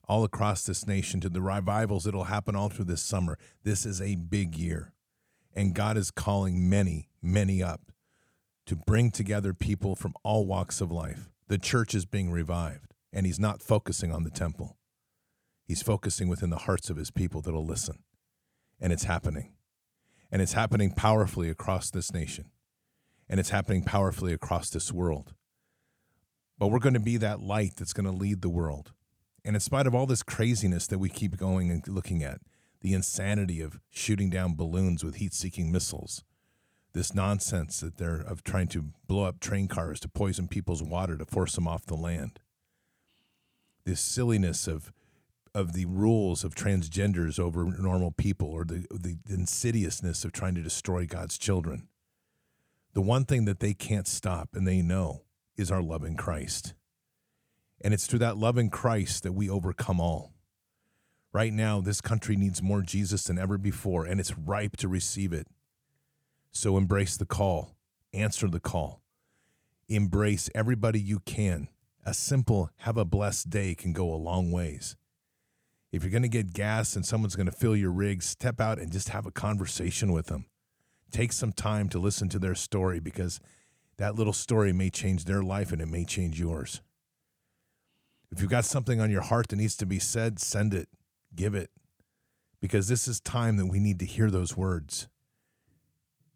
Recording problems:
none

